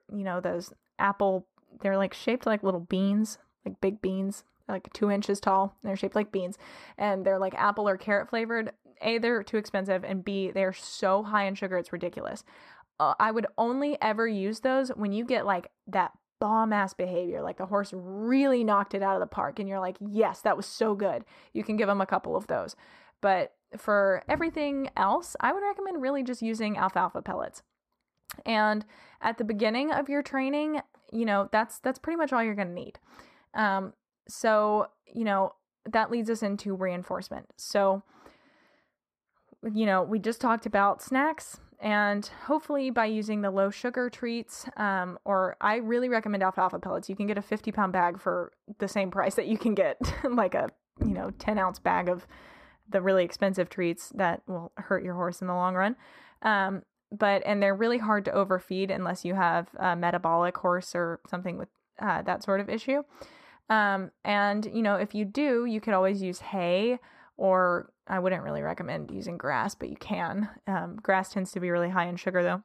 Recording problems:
muffled; slightly; fading above 2.5 kHz

